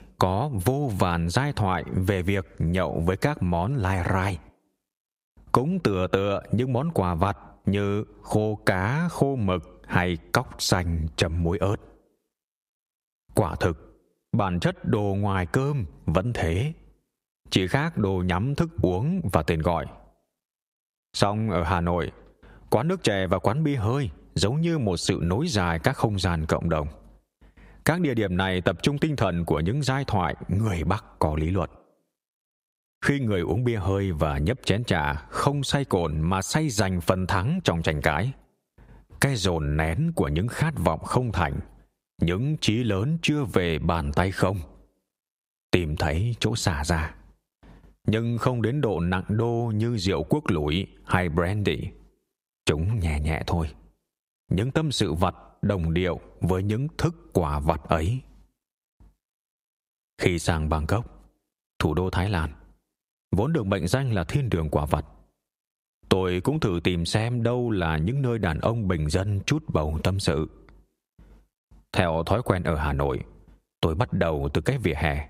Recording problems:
squashed, flat; heavily

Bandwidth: 15.5 kHz